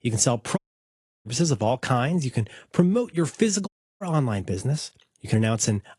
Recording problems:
garbled, watery; slightly; nothing above 11 kHz
audio cutting out; at 0.5 s for 0.5 s and at 3.5 s

